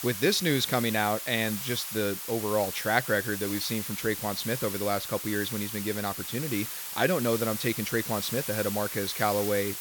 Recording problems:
hiss; loud; throughout; 5 dB below the speech

